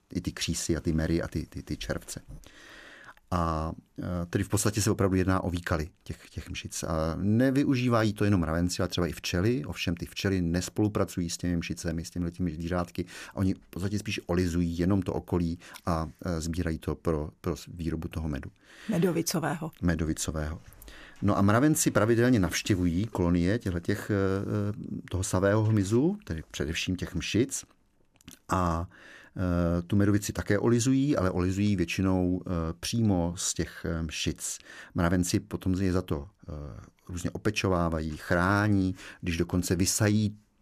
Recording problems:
none

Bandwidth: 14.5 kHz